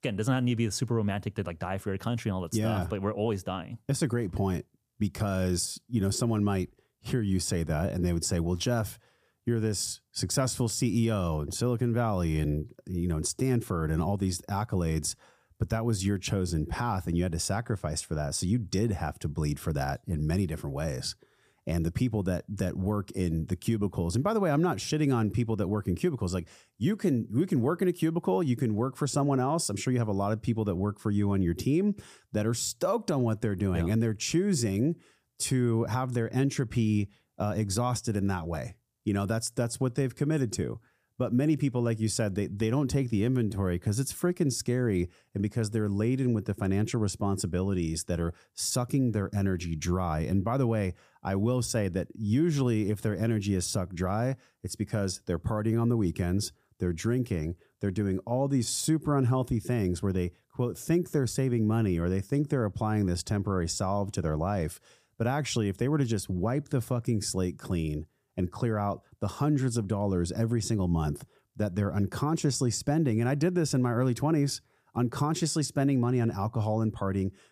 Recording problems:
none

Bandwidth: 15 kHz